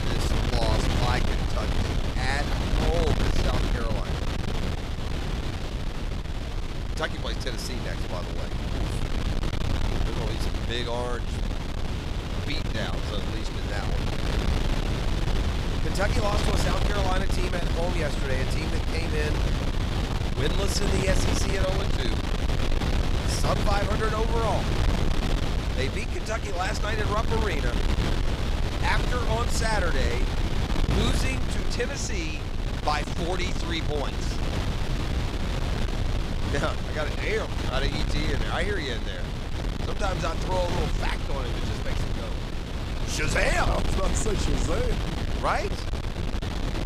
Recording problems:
wind noise on the microphone; heavy; 3 dB below the speech

